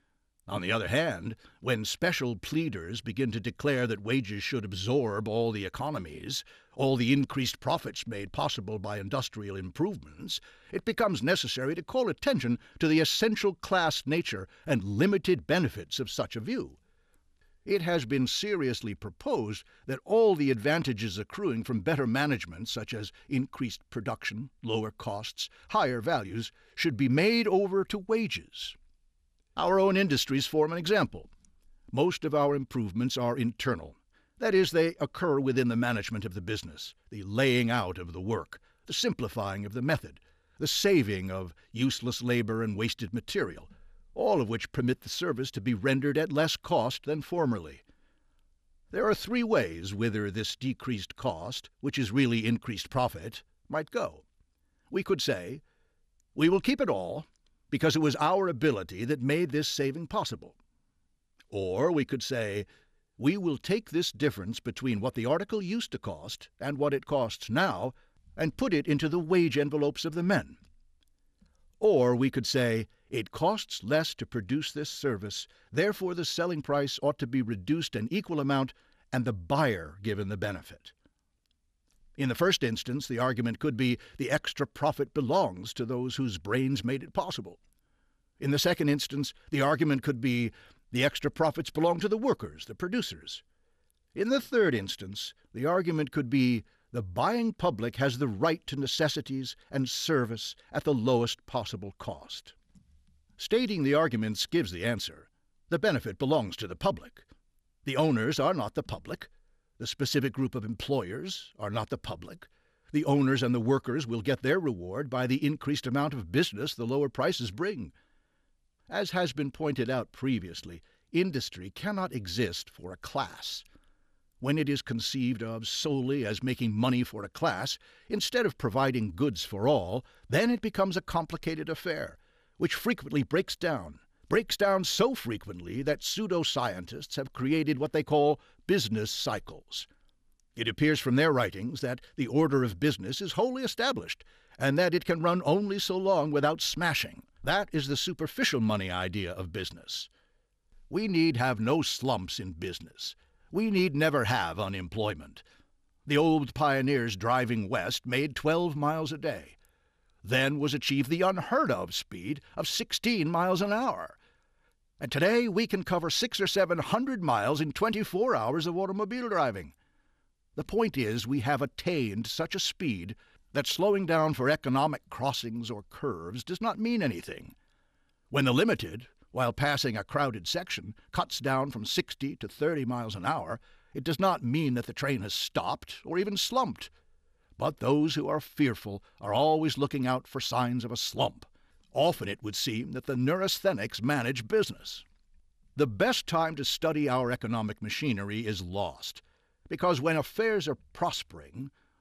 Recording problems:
none

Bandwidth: 14.5 kHz